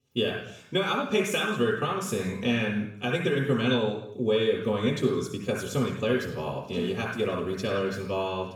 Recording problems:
off-mic speech; far
room echo; noticeable; dies away in 0.7 s

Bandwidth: 18.5 kHz